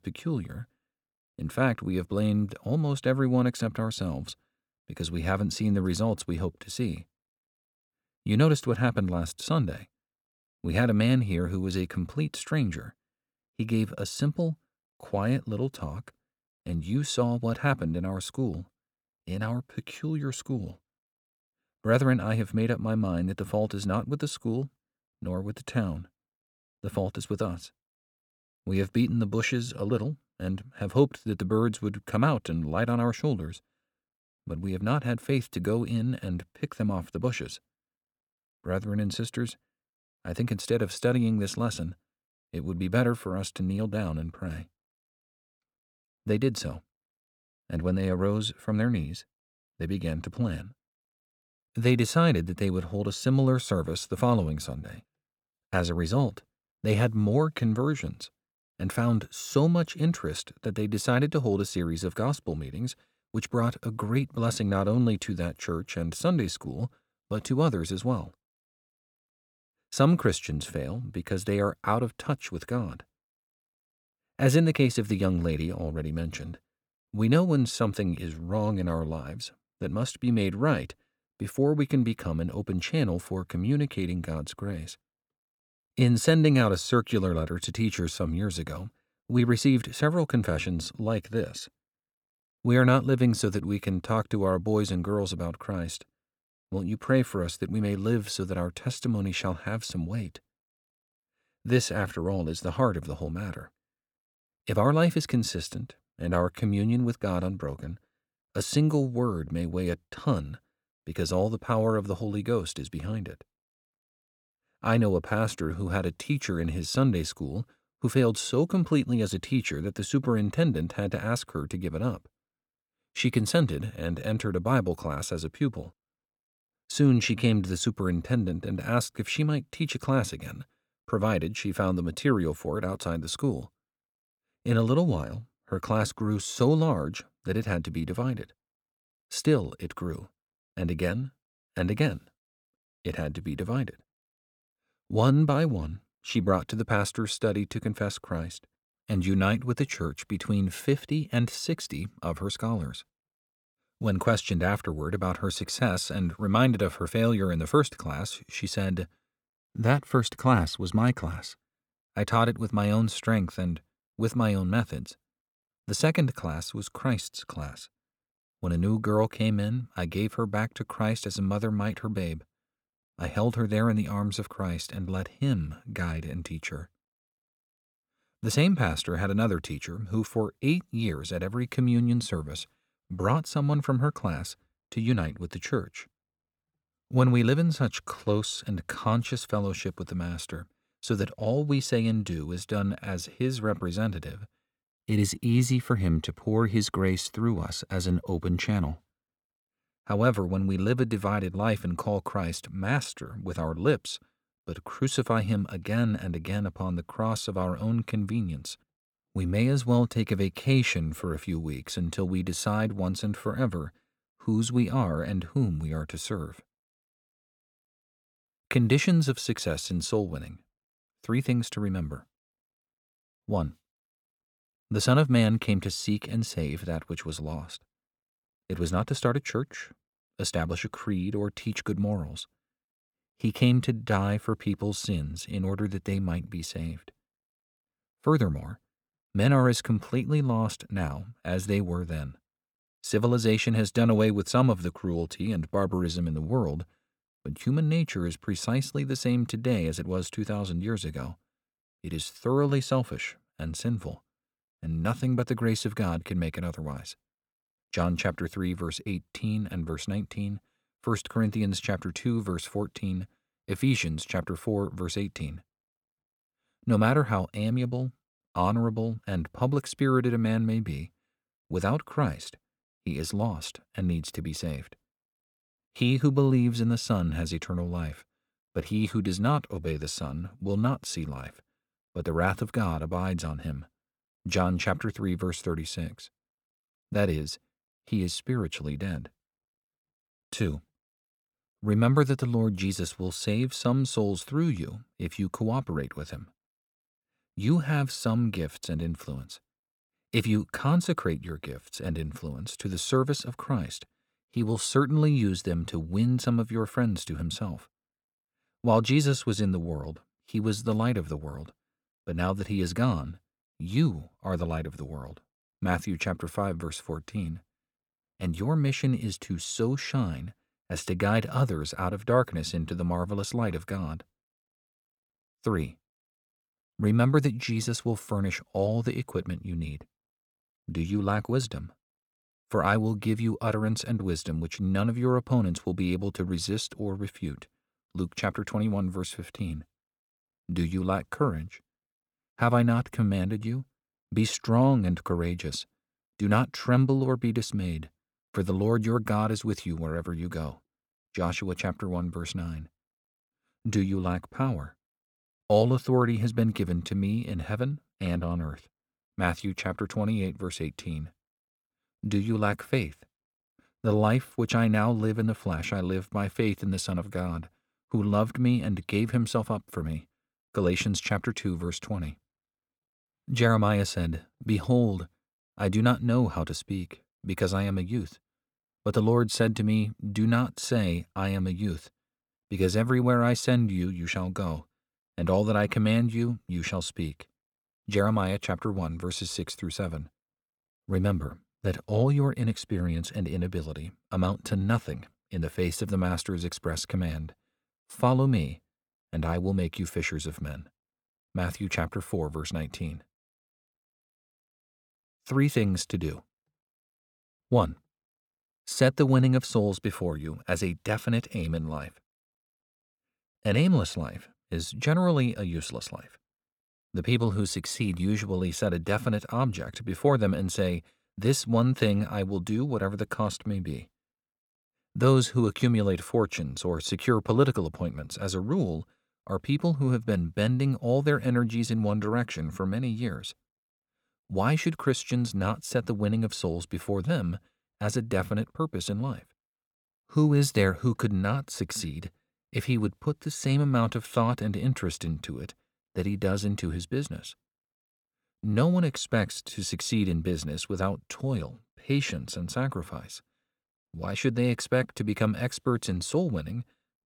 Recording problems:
none

